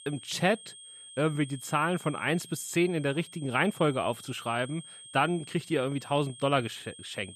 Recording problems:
high-pitched whine; noticeable; throughout; 3.5 kHz, 15 dB below the speech

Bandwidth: 14.5 kHz